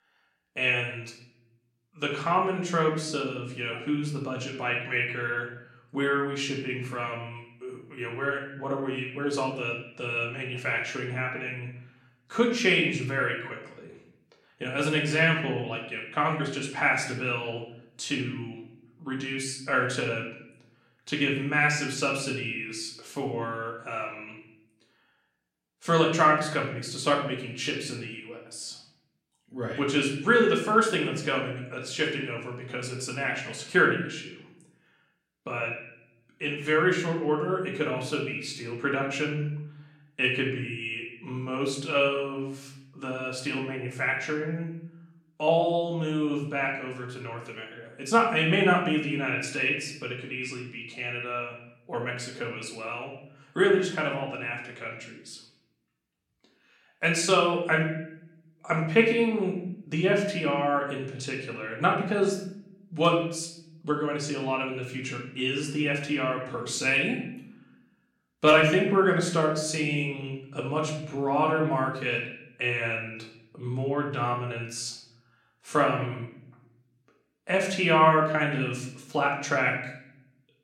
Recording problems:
room echo; slight; dies away in 0.7 s
off-mic speech; somewhat distant

